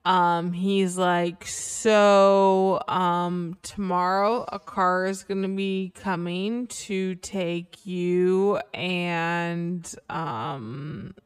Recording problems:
wrong speed, natural pitch; too slow; 0.6 times normal speed

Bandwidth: 15 kHz